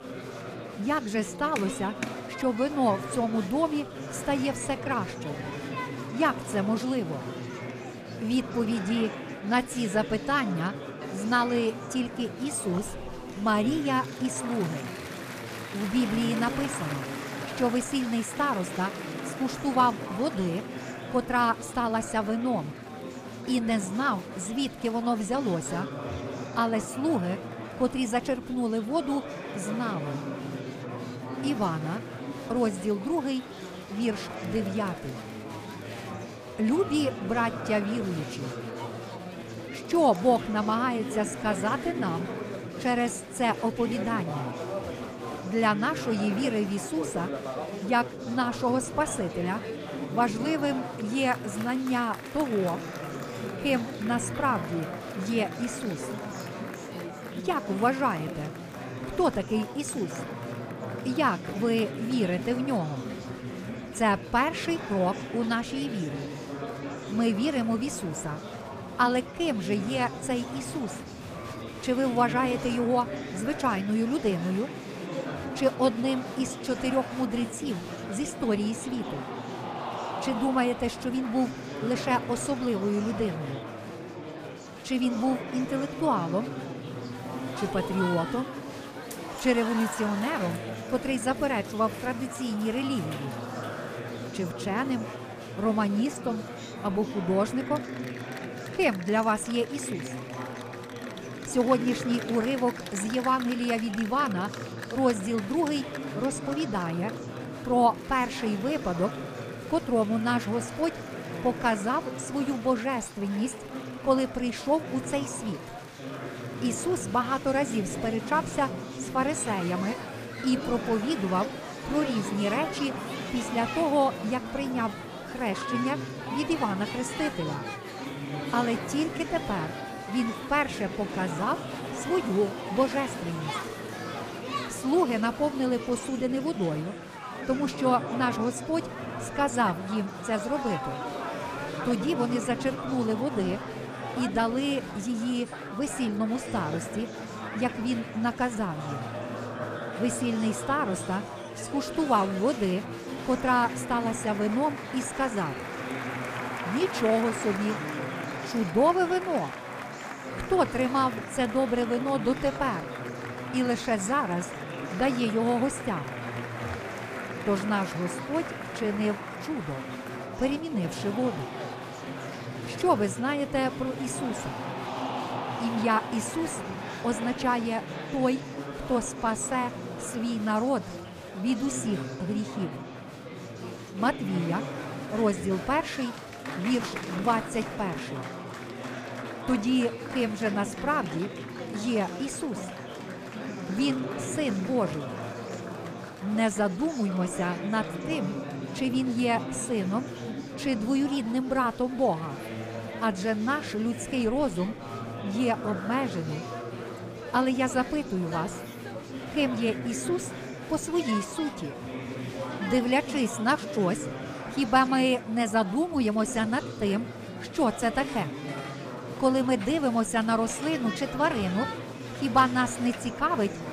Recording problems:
murmuring crowd; loud; throughout; 8 dB below the speech

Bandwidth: 15 kHz